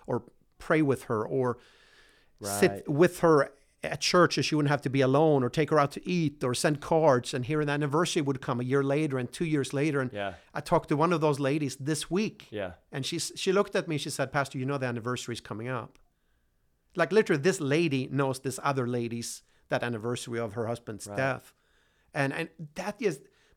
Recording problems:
none

